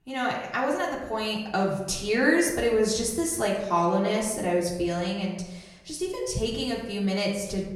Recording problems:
off-mic speech; far
room echo; noticeable; dies away in 0.8 s

